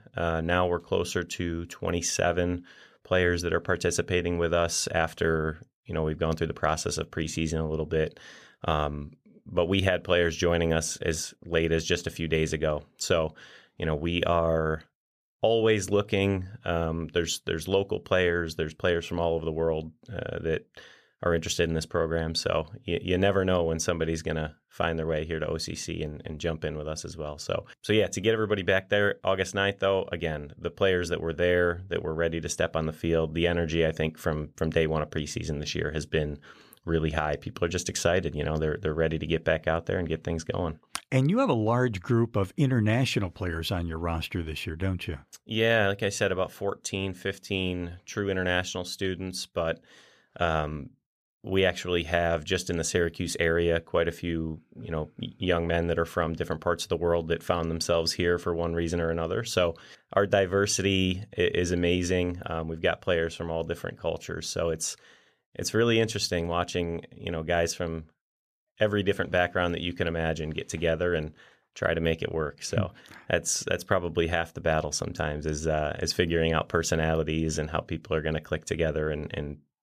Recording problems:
none

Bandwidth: 14.5 kHz